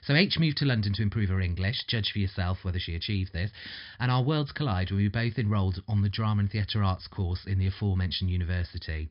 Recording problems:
high frequencies cut off; noticeable; nothing above 5.5 kHz

